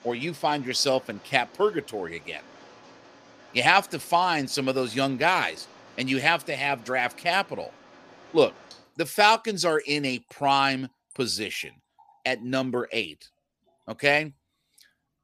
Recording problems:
rain or running water; faint; throughout; 25 dB below the speech

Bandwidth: 15 kHz